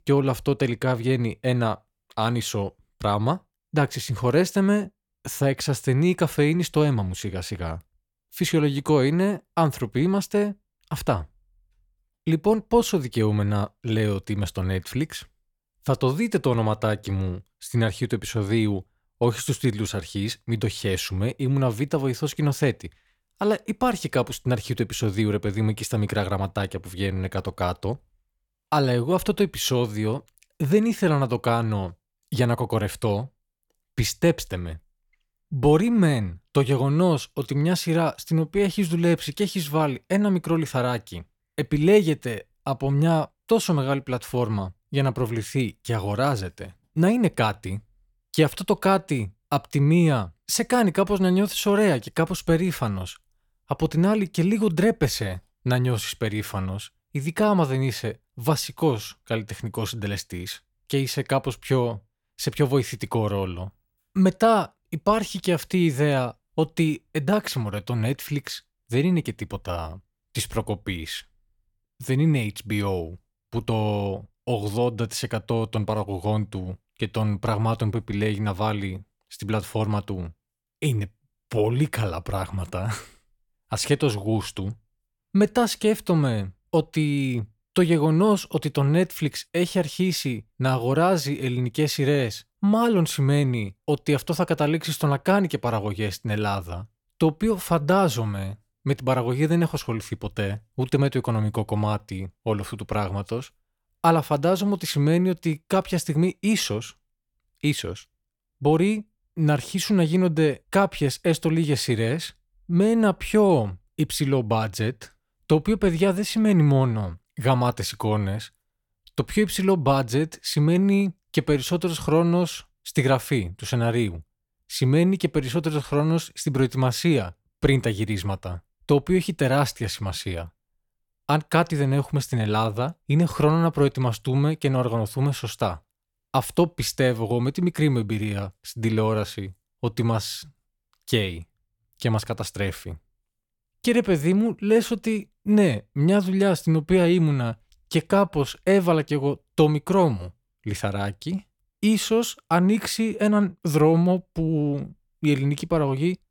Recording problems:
none

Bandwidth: 18 kHz